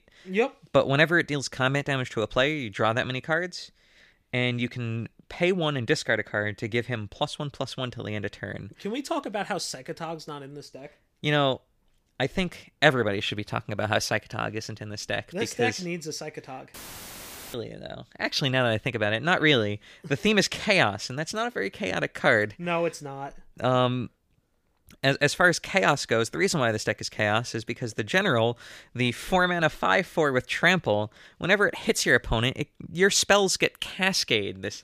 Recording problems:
audio cutting out; filled with static; at 17 s for 1 s

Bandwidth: 15 kHz